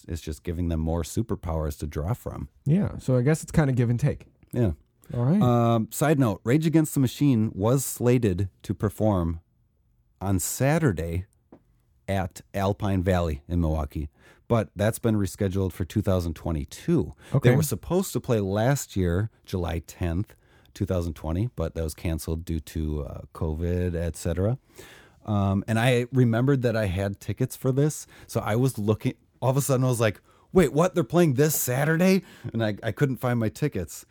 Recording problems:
none

